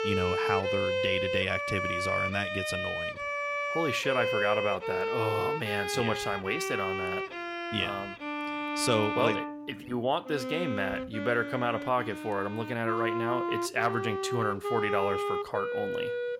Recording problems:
background music; loud; throughout; 1 dB below the speech

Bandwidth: 16.5 kHz